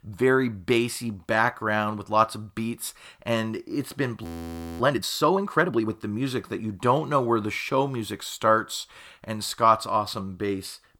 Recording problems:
audio freezing; at 4 s for 0.5 s

